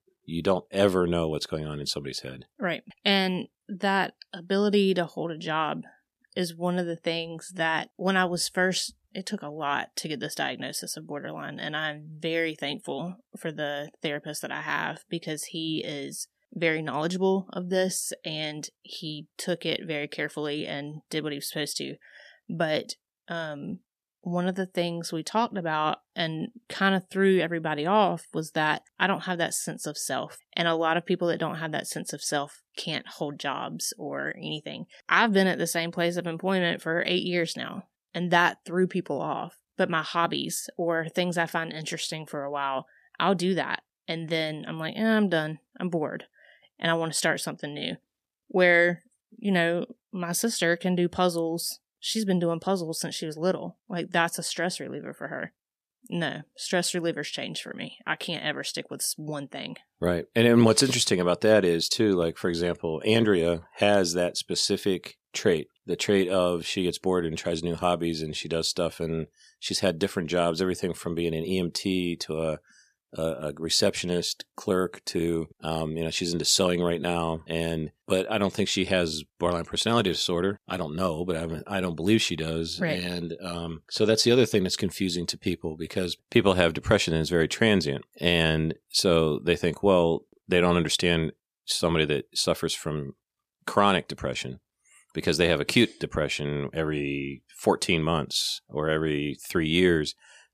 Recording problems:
none

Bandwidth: 14.5 kHz